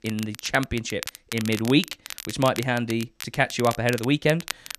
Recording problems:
crackle, like an old record; noticeable; 10 dB below the speech

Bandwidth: 14 kHz